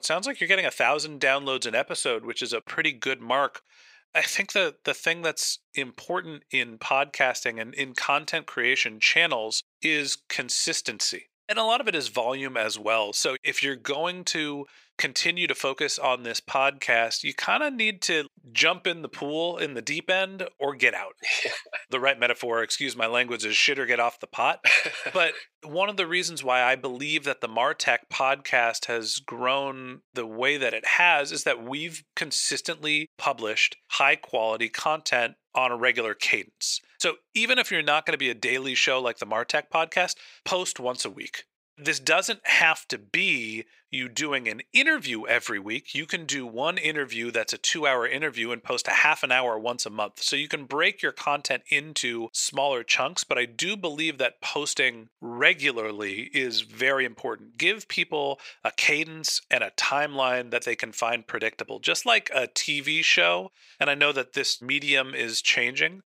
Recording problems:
thin; very; fading below 500 Hz

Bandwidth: 15.5 kHz